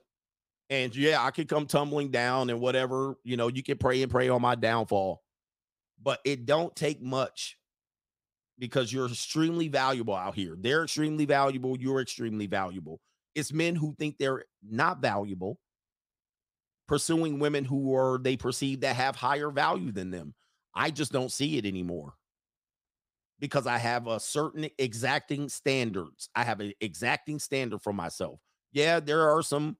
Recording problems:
none

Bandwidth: 15.5 kHz